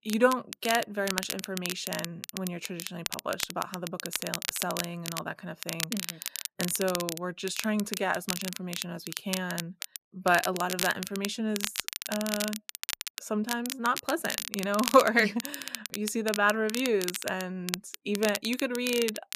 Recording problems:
crackle, like an old record; loud; 5 dB below the speech

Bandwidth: 14.5 kHz